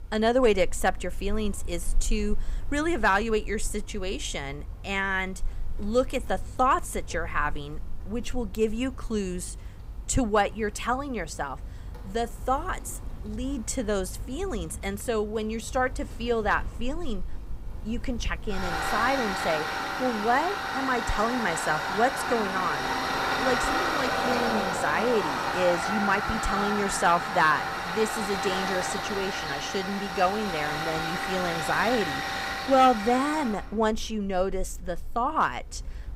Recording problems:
machinery noise; loud; throughout; 4 dB below the speech

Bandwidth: 15.5 kHz